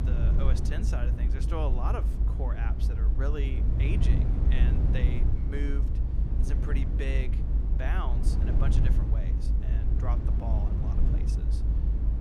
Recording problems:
low rumble; loud; throughout; 2 dB below the speech

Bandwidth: 15.5 kHz